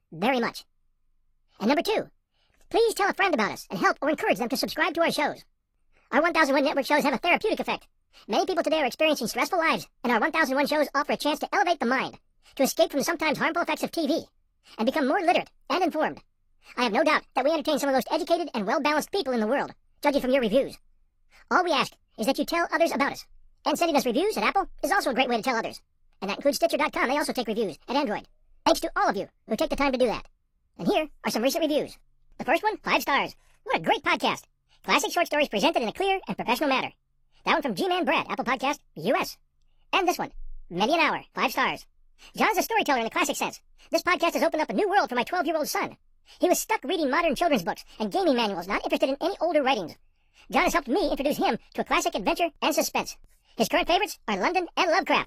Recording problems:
wrong speed and pitch; too fast and too high; 1.6 times normal speed
garbled, watery; slightly

